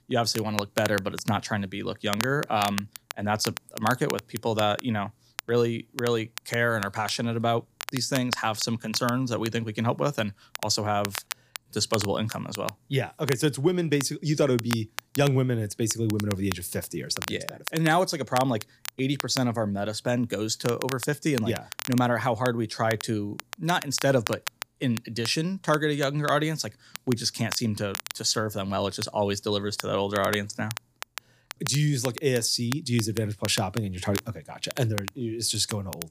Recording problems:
crackle, like an old record; noticeable; 10 dB below the speech

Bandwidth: 15 kHz